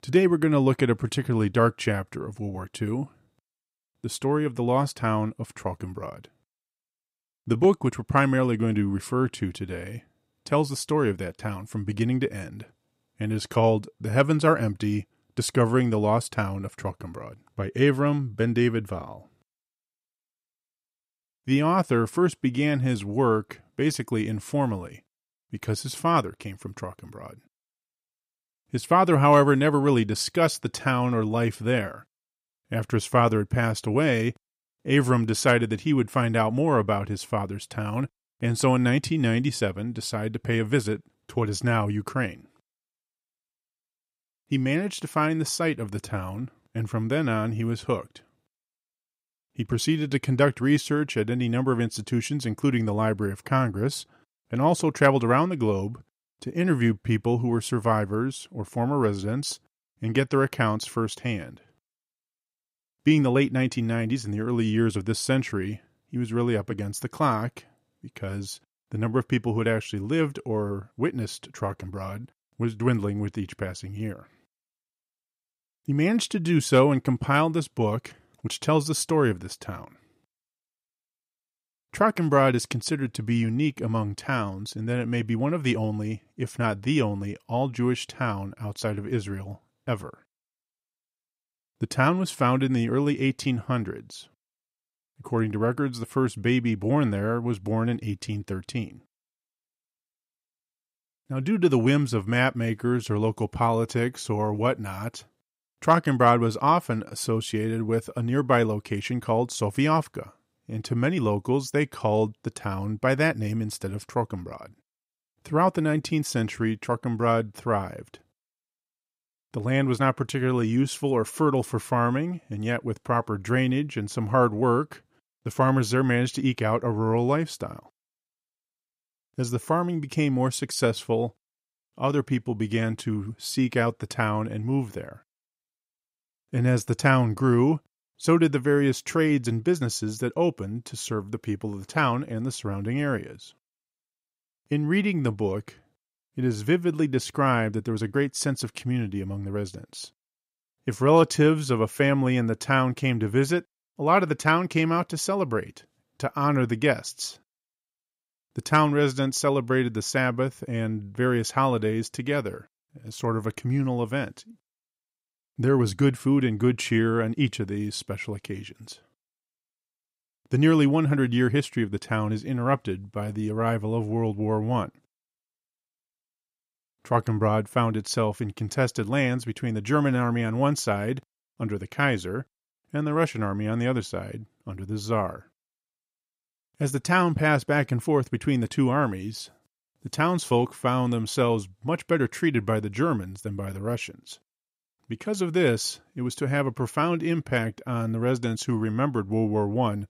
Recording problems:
none

